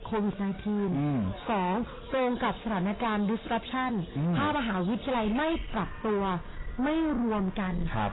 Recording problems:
distortion; heavy; 7 dB below the speech
garbled, watery; badly; nothing above 4 kHz
animal sounds; noticeable; throughout; 15 dB below the speech

